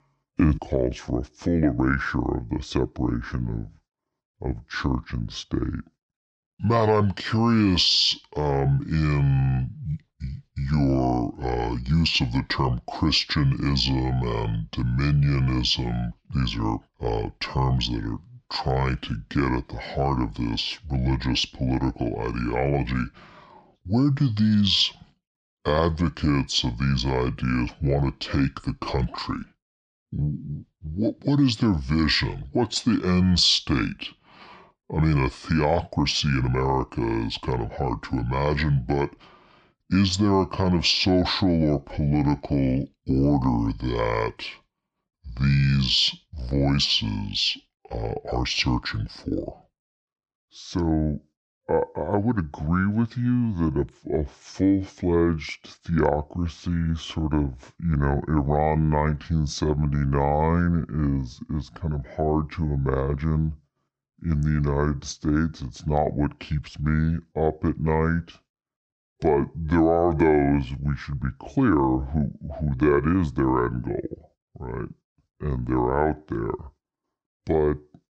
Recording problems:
wrong speed and pitch; too slow and too low; 0.7 times normal speed

